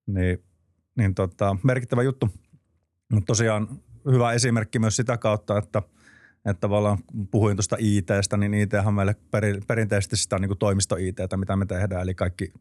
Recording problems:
none

